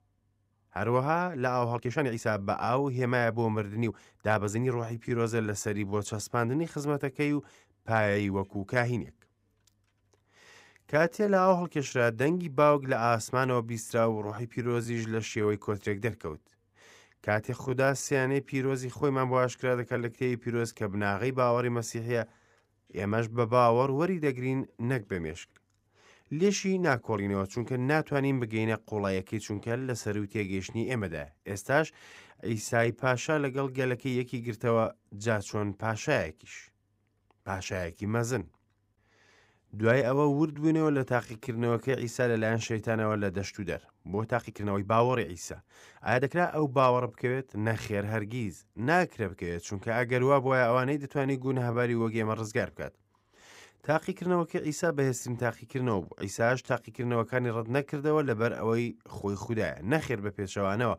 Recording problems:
uneven, jittery; strongly; from 1.5 to 52 s

